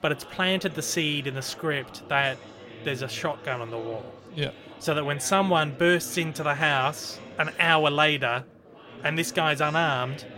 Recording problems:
chatter from many people; noticeable; throughout; 20 dB below the speech

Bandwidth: 16 kHz